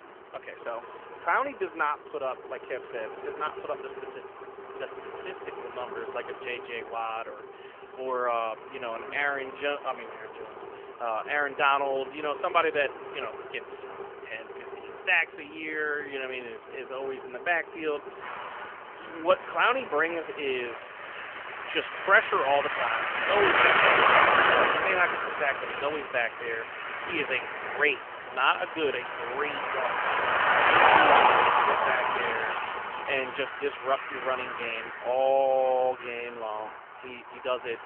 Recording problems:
phone-call audio; nothing above 3 kHz
traffic noise; very loud; throughout; 3 dB above the speech

